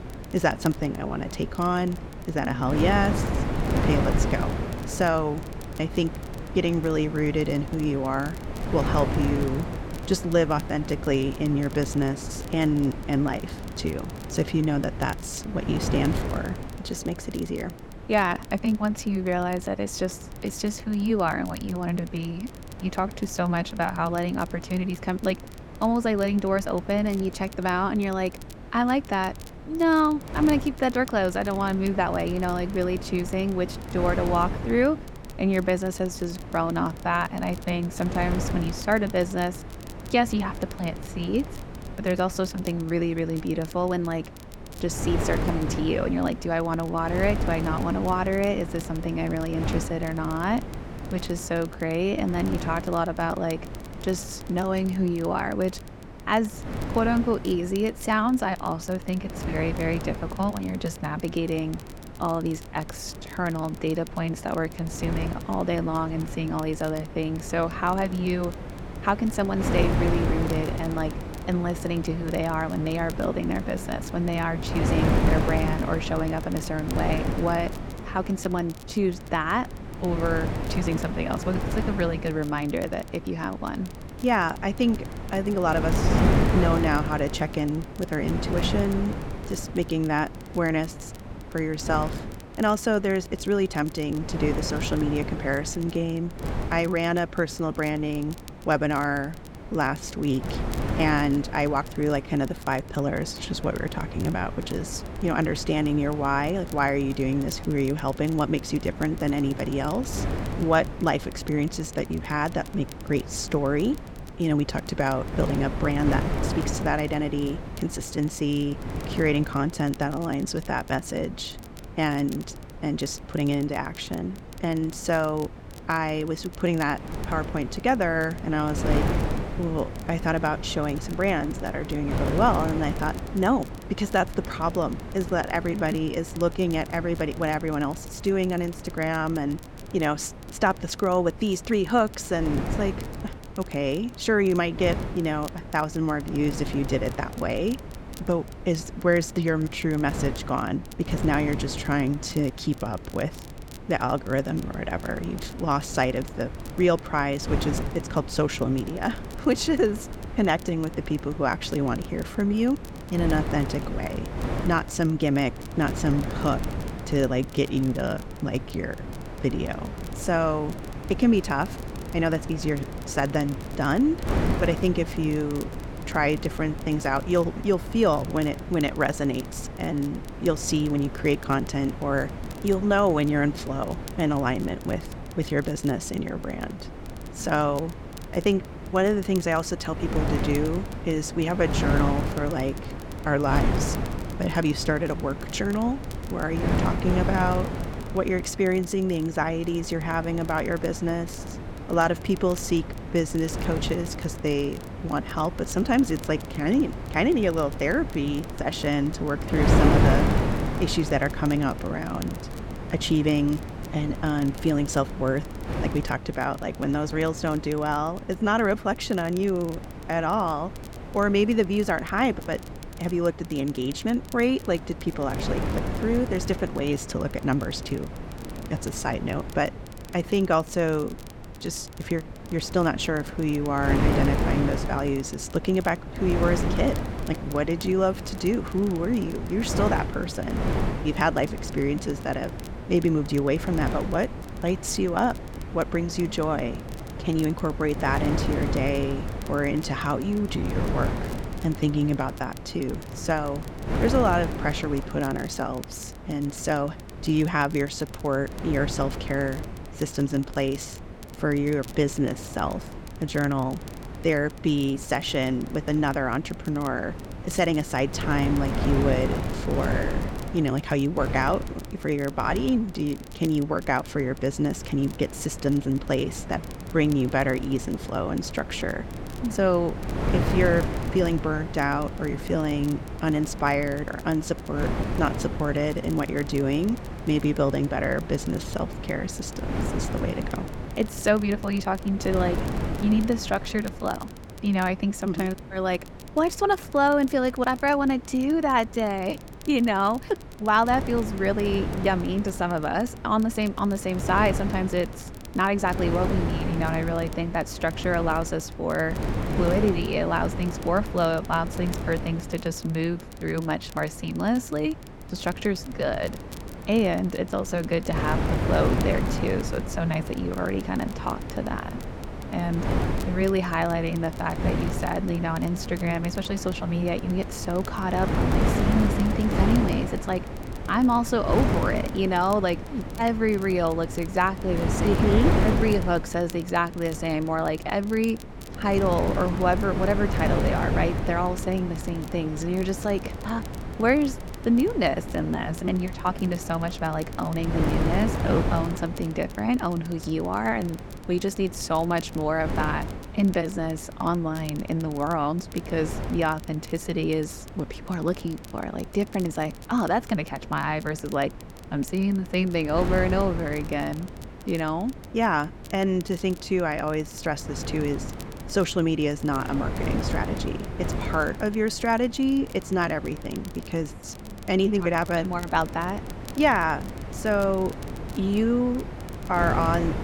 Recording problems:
wind noise on the microphone; heavy; 10 dB below the speech
crackle, like an old record; faint; 25 dB below the speech

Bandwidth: 17 kHz